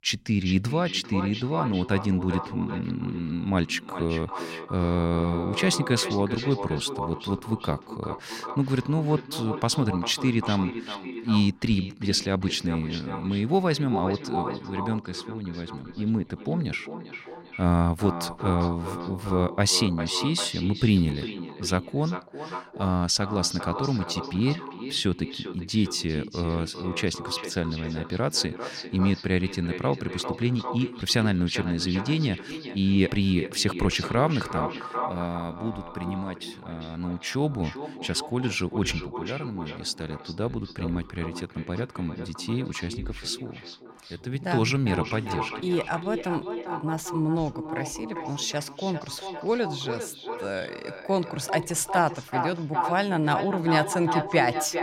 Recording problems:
echo of what is said; strong; throughout; 400 ms later, 8 dB below the speech

